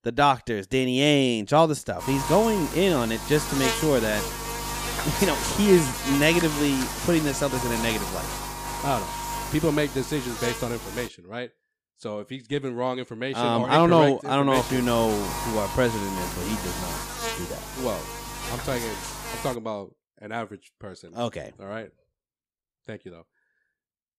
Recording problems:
electrical hum; loud; from 2 to 11 s and from 15 to 20 s; 50 Hz, 5 dB below the speech

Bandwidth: 15 kHz